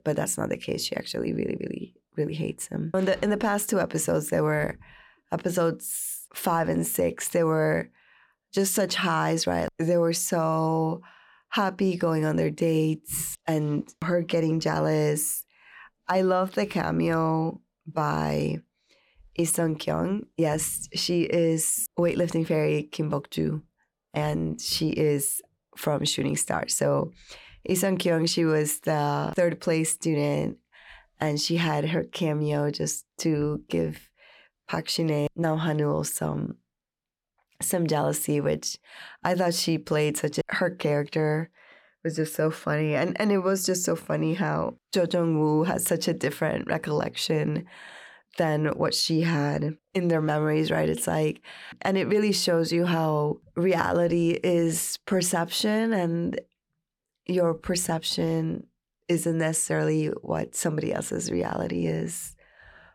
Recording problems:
none

